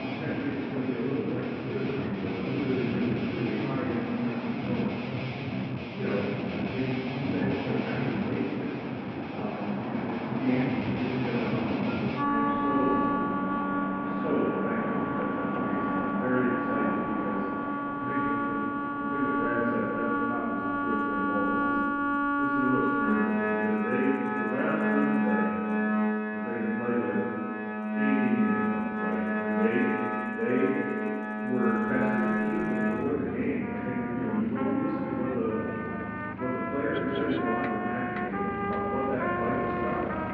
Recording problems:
room echo; strong; dies away in 1.8 s
off-mic speech; far
muffled; very; fading above 2.5 kHz
background music; very loud; throughout; 1 dB above the speech
traffic noise; loud; throughout; 4 dB below the speech

